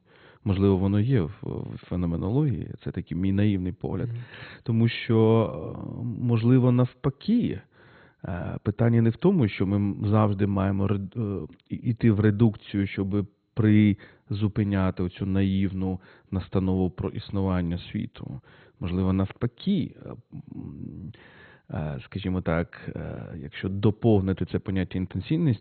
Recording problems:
garbled, watery; badly; nothing above 4 kHz

